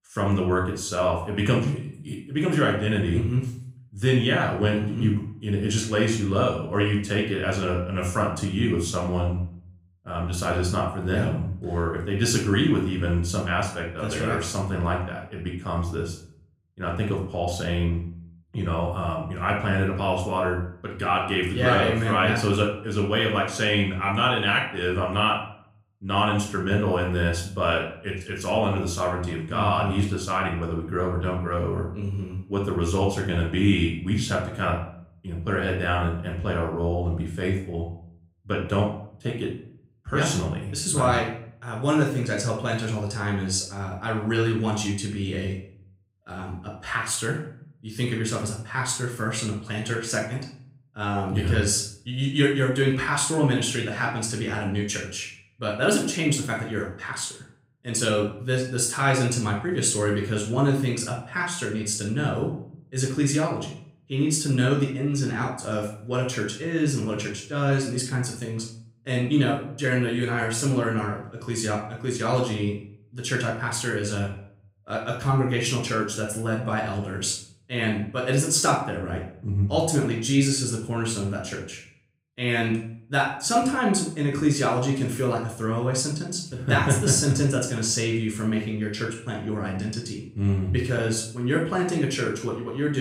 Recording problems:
room echo; noticeable; dies away in 0.5 s
off-mic speech; somewhat distant
abrupt cut into speech; at the end

